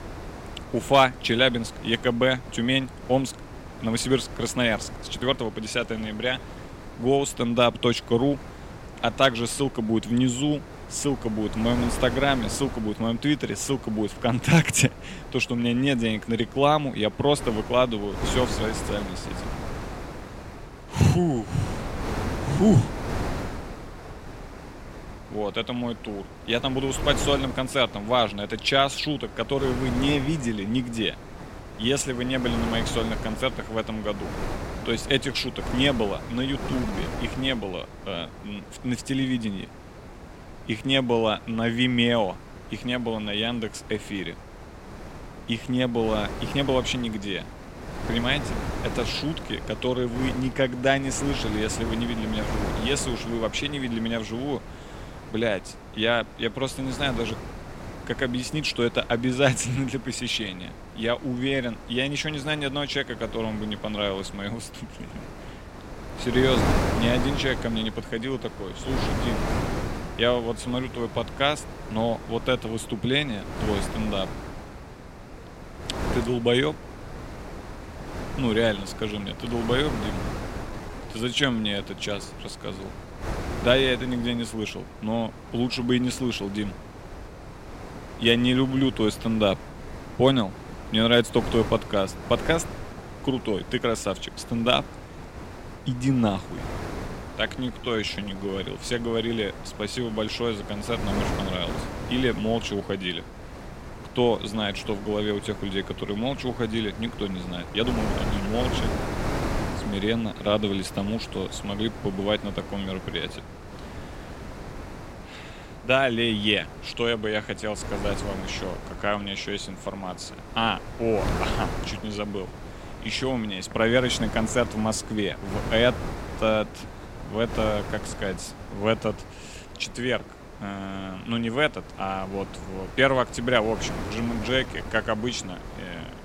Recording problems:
wind noise on the microphone; occasional gusts; 10 dB below the speech
uneven, jittery; strongly; from 5 s to 2:15

